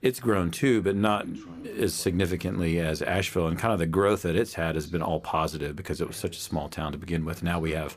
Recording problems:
voice in the background; faint; throughout; 25 dB below the speech

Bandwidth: 15 kHz